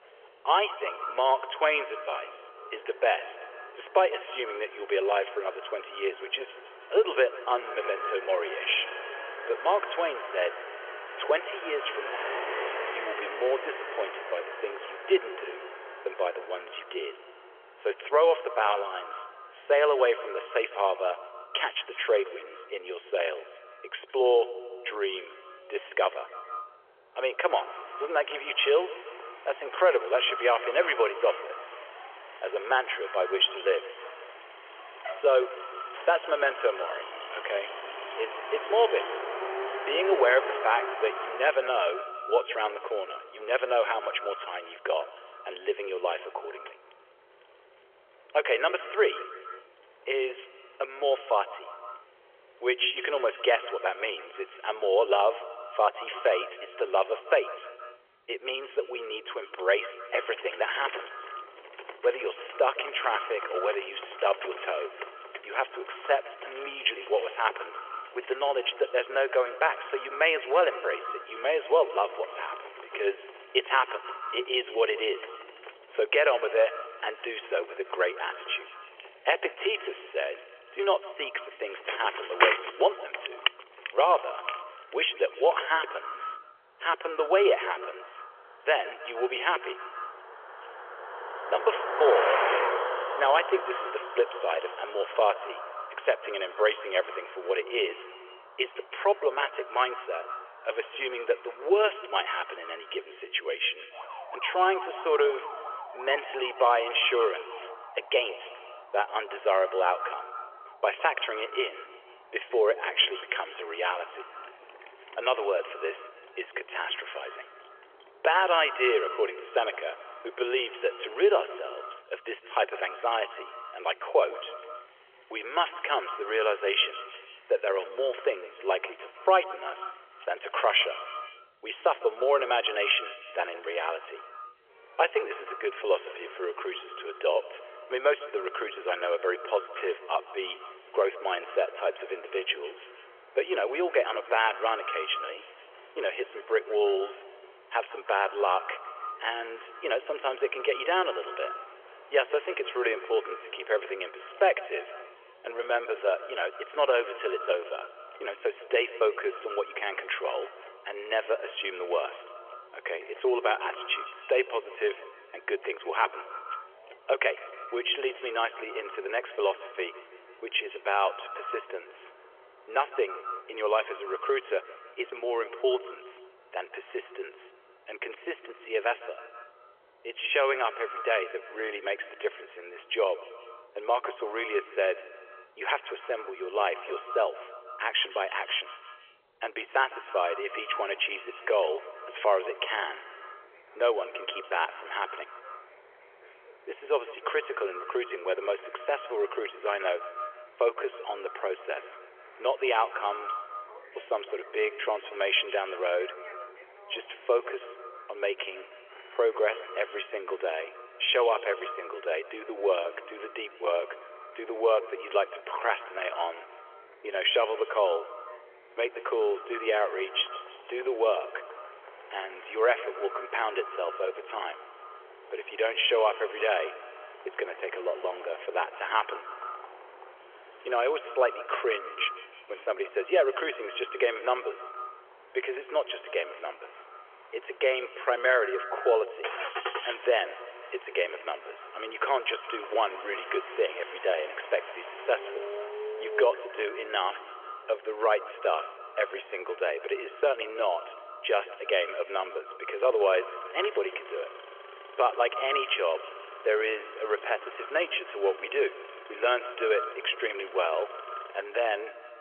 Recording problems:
echo of what is said; noticeable; throughout; 160 ms later, 15 dB below the speech
phone-call audio; nothing above 3.5 kHz
traffic noise; noticeable; throughout; 10 dB below the speech

